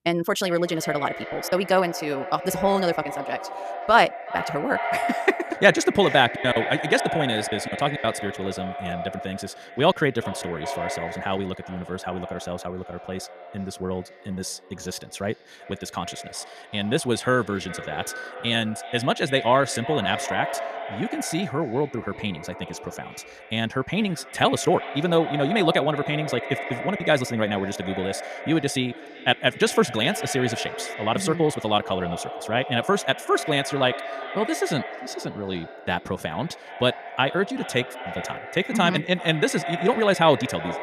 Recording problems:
echo of what is said; strong; throughout; 380 ms later, 9 dB below the speech
wrong speed, natural pitch; too fast; 1.6 times normal speed
choppy; very; from 1.5 to 2.5 s, from 6.5 to 10 s and from 25 to 27 s; 6% of the speech affected

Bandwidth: 14.5 kHz